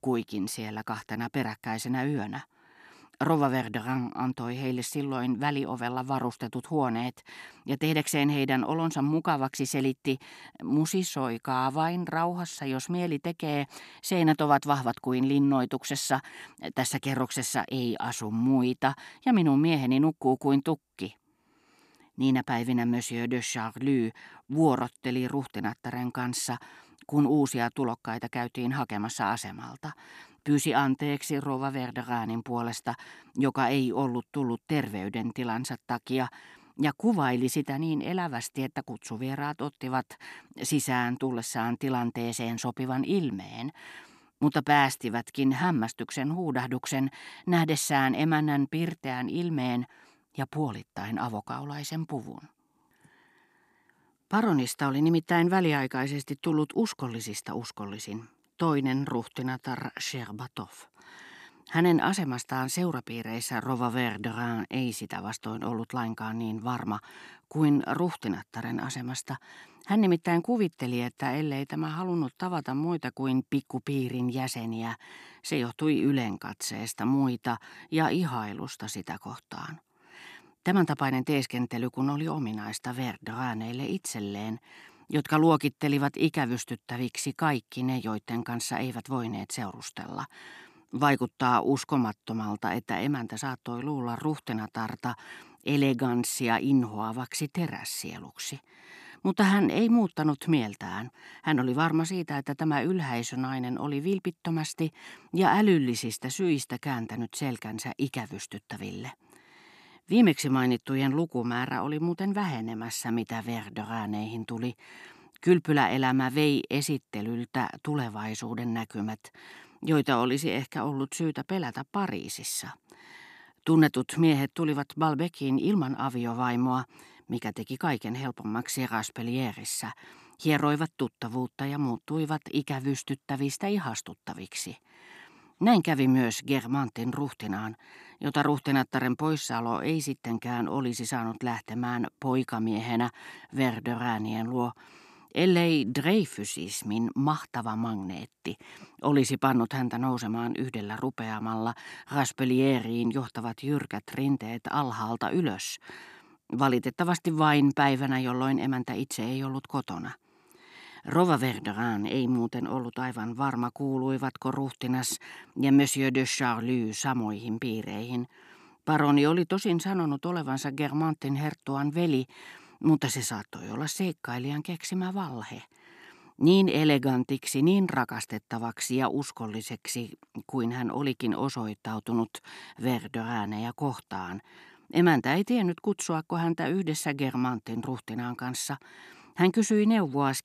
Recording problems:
none

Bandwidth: 13.5 kHz